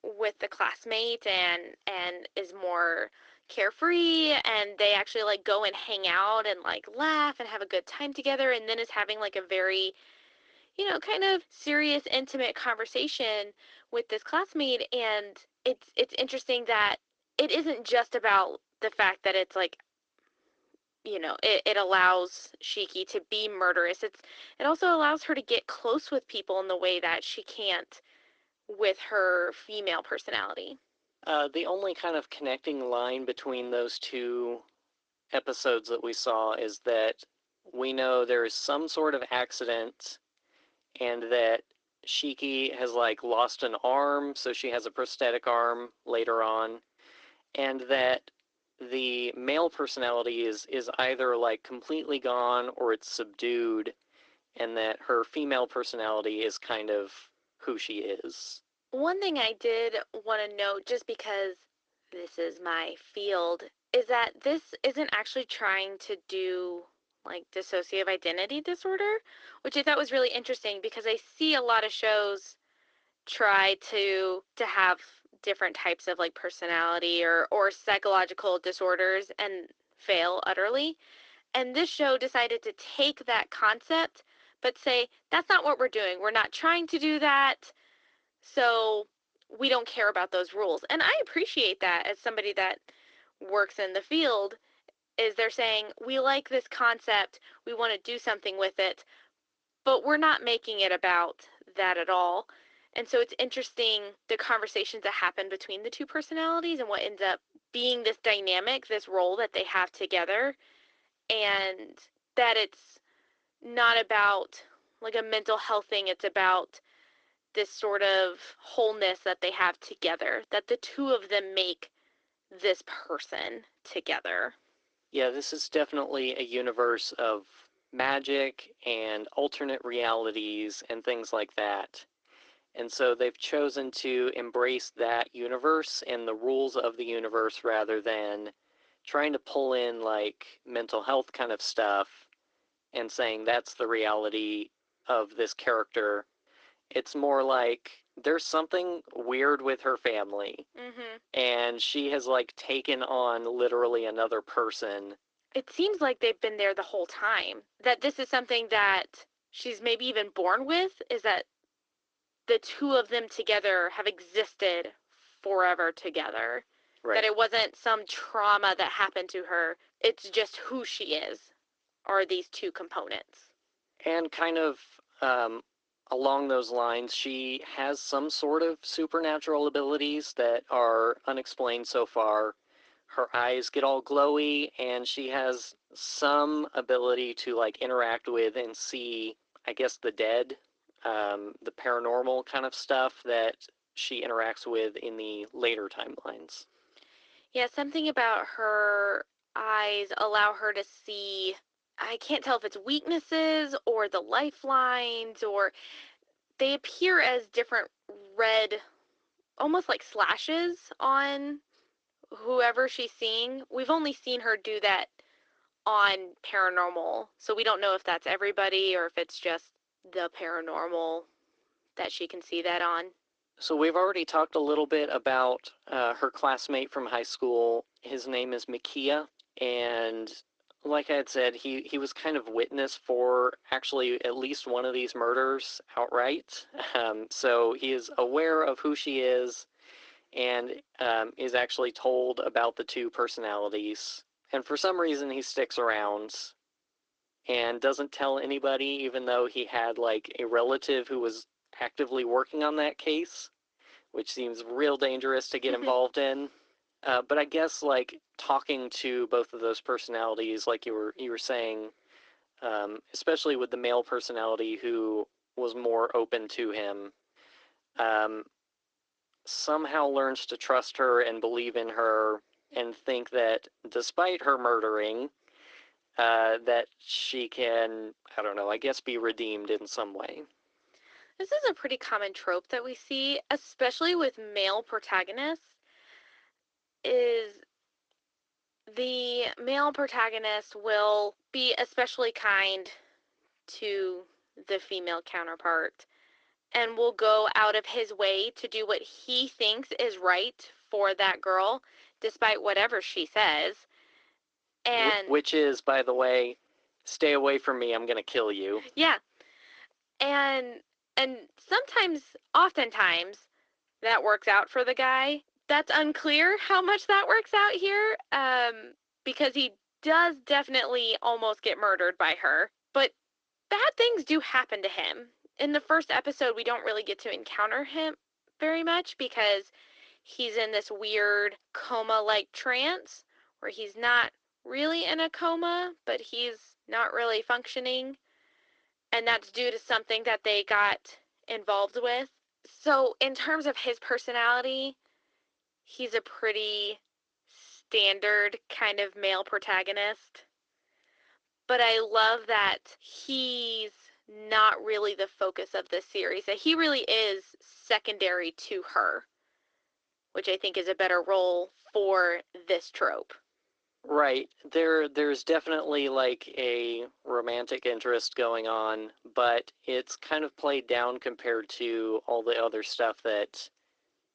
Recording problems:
thin; somewhat; fading below 300 Hz
garbled, watery; slightly

